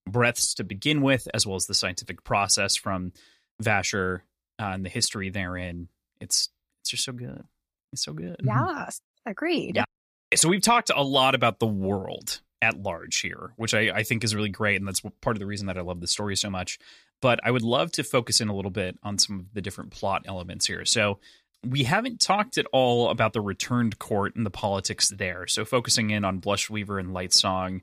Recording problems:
none

